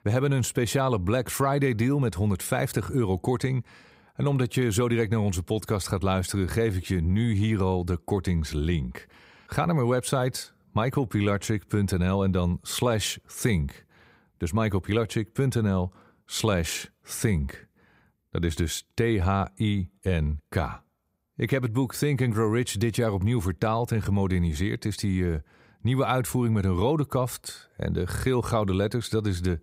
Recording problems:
none

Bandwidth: 15.5 kHz